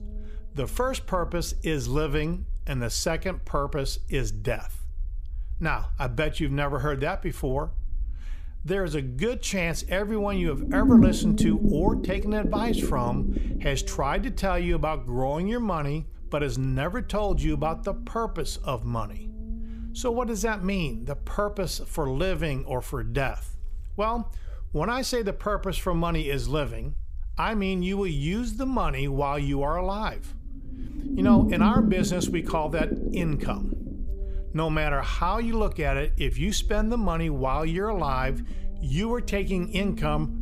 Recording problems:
low rumble; loud; throughout; 3 dB below the speech

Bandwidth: 15 kHz